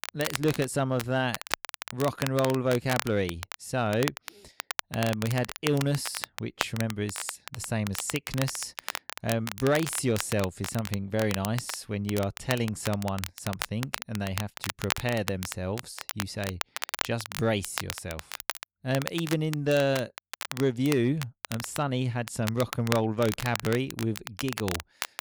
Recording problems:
crackle, like an old record; loud; 7 dB below the speech

